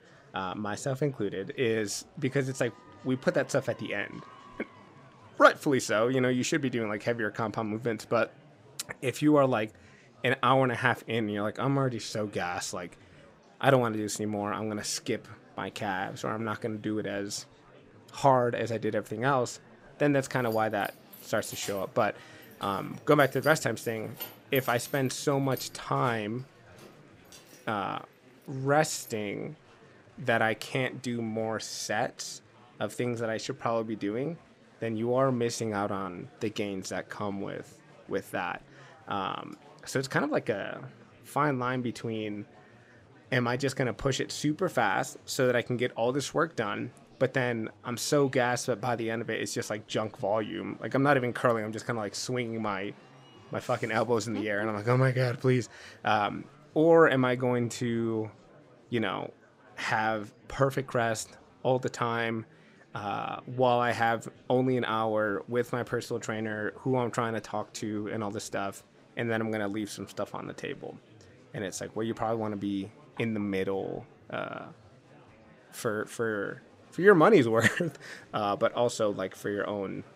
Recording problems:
murmuring crowd; faint; throughout; 25 dB below the speech
jangling keys; faint; from 20 to 28 s; peak 10 dB below the speech

